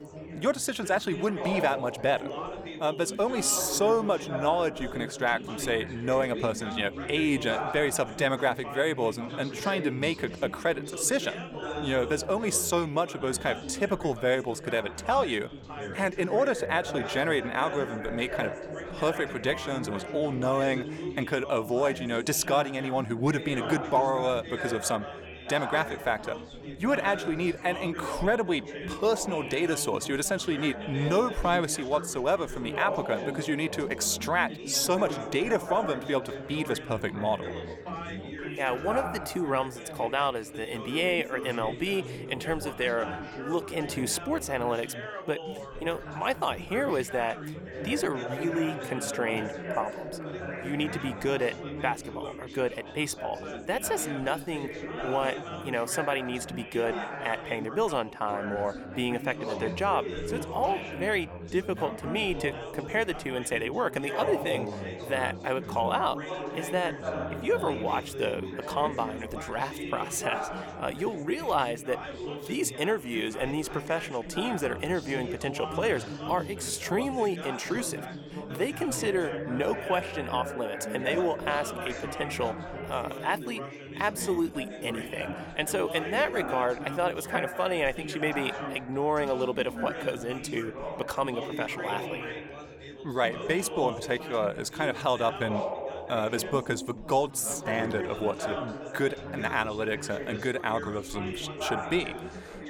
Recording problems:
background chatter; loud; throughout; 4 voices, 8 dB below the speech

